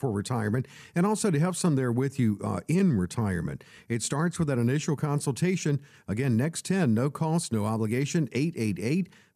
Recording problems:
none

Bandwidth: 14.5 kHz